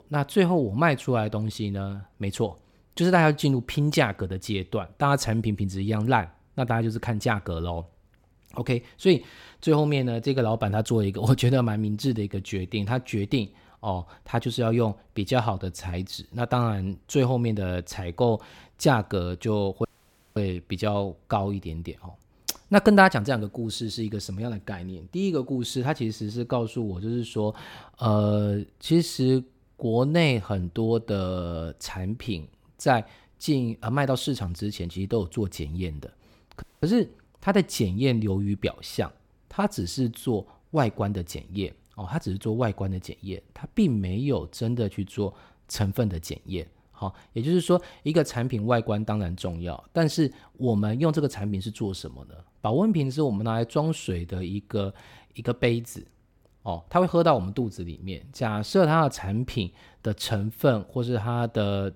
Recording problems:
audio cutting out; at 20 s for 0.5 s and at 37 s

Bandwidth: 18 kHz